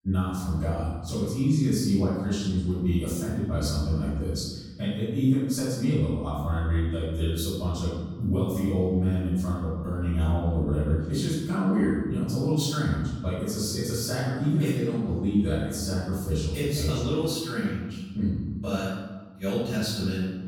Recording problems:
room echo; strong; dies away in 1.1 s
off-mic speech; far

